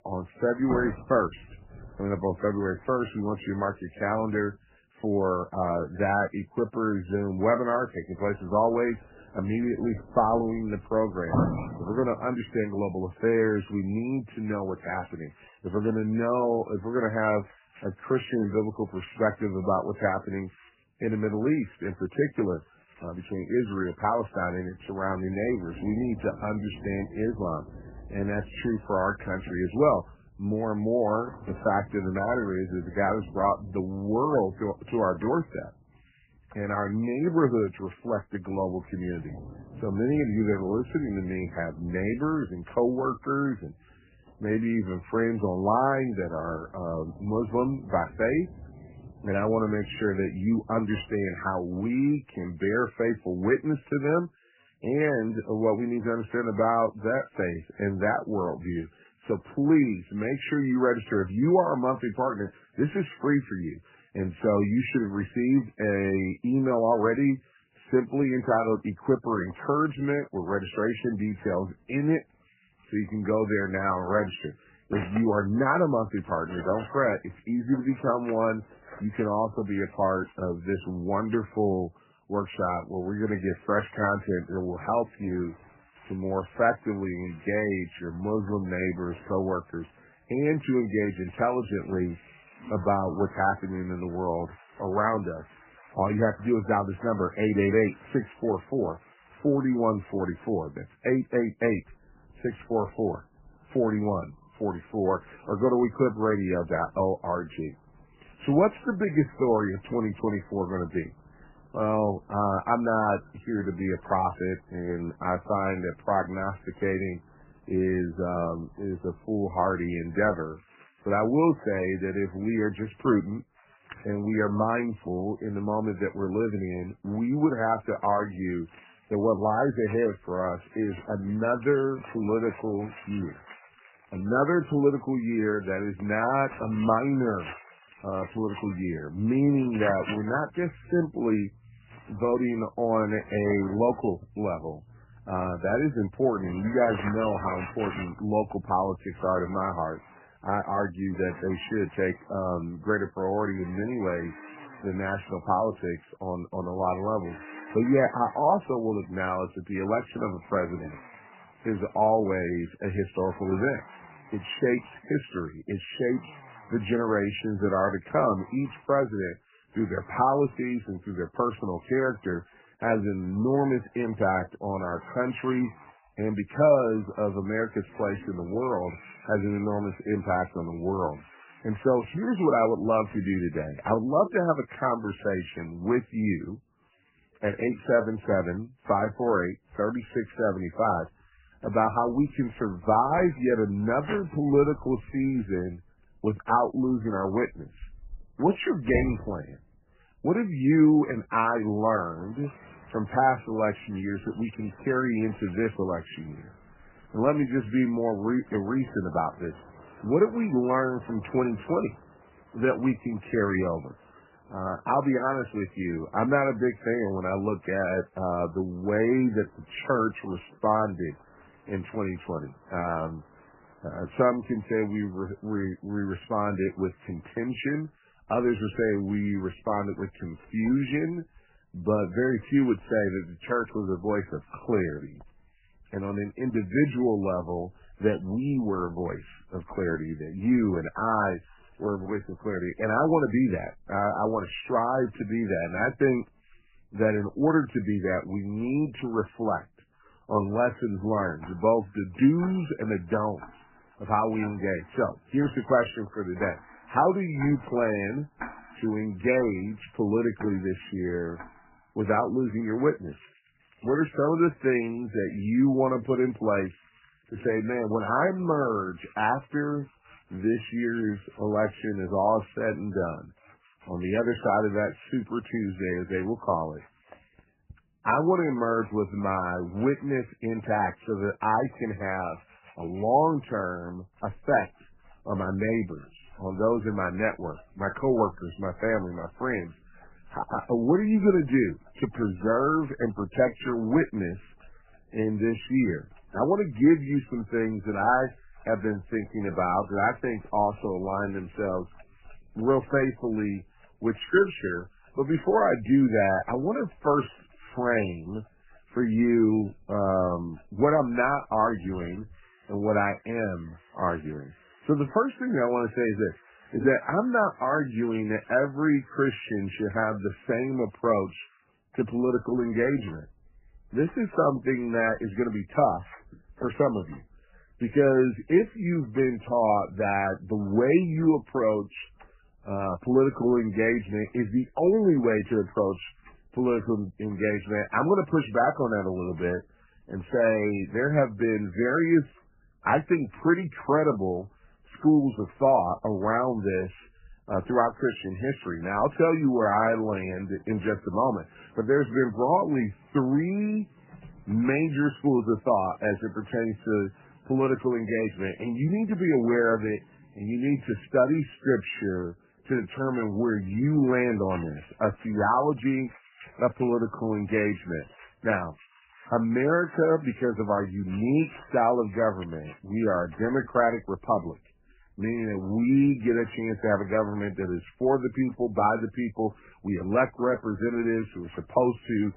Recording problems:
garbled, watery; badly; nothing above 3 kHz
household noises; faint; throughout; 20 dB below the speech

